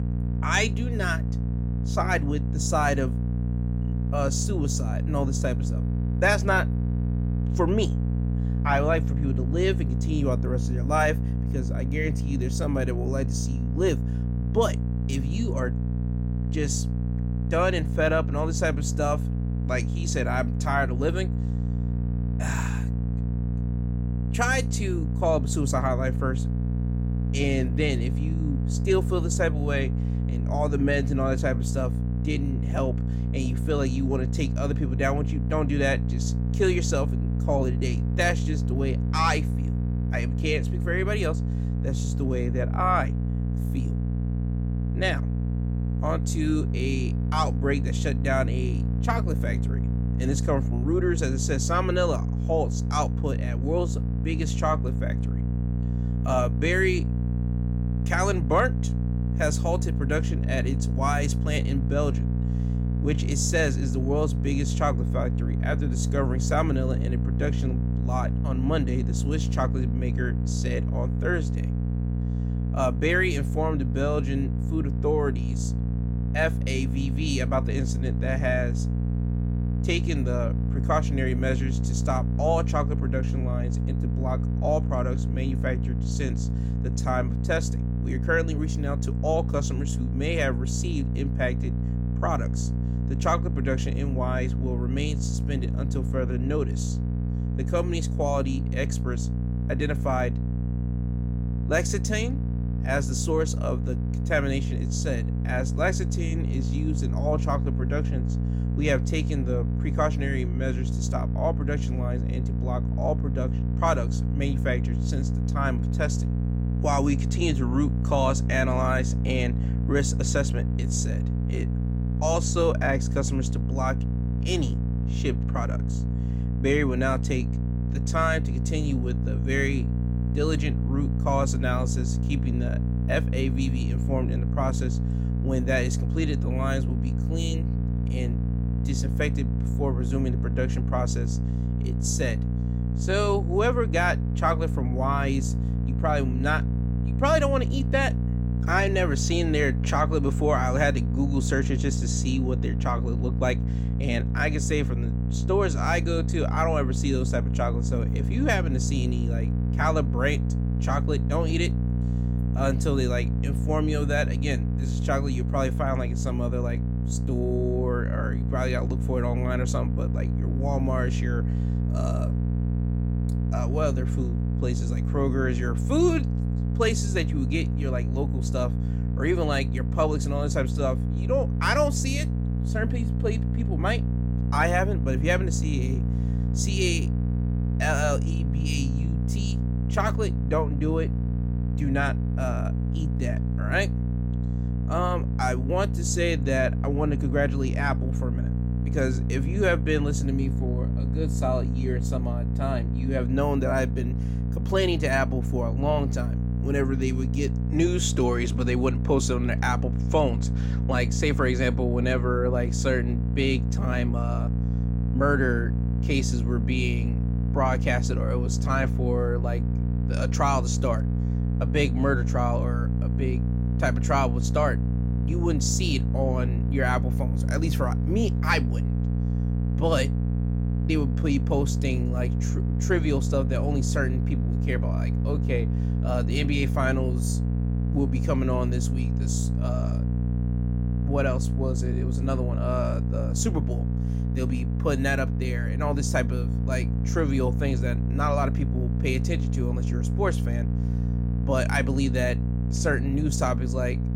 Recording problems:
electrical hum; loud; throughout; 60 Hz, 9 dB below the speech

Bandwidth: 16 kHz